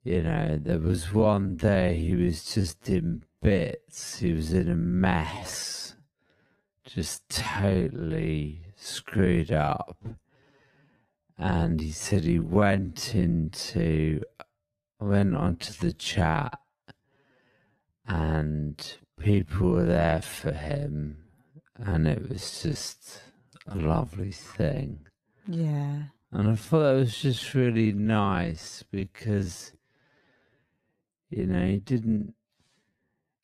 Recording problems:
wrong speed, natural pitch; too slow; 0.5 times normal speed

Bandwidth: 14.5 kHz